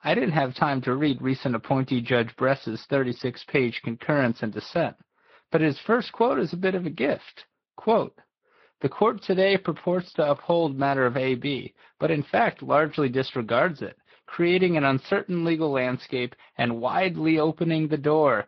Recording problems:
garbled, watery; slightly; nothing above 5 kHz
high frequencies cut off; slight

